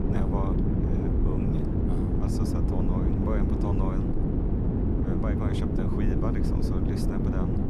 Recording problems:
wind noise on the microphone; heavy; 5 dB above the speech

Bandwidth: 13.5 kHz